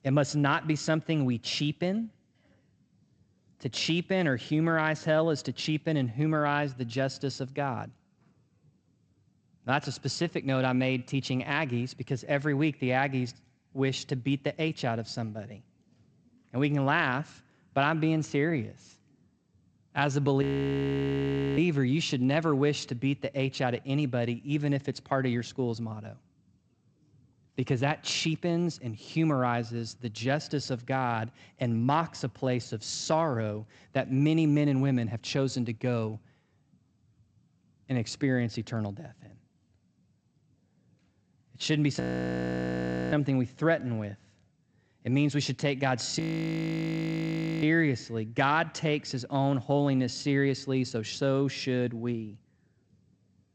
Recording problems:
garbled, watery; slightly; nothing above 7.5 kHz
audio freezing; at 20 s for 1 s, at 42 s for 1 s and at 46 s for 1.5 s

